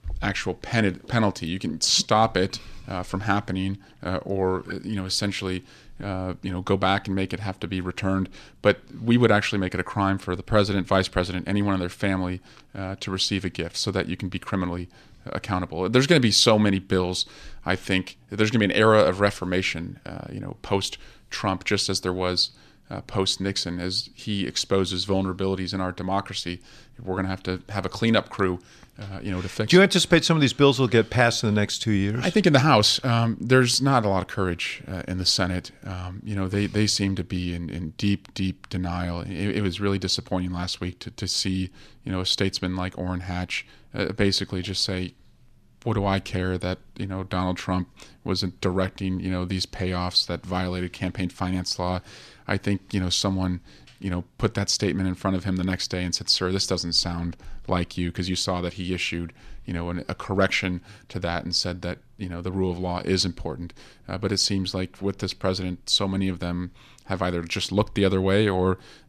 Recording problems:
none

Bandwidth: 14 kHz